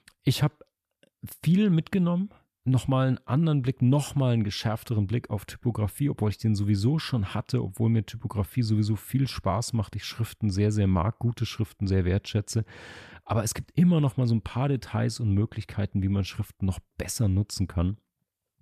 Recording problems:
none

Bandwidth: 14.5 kHz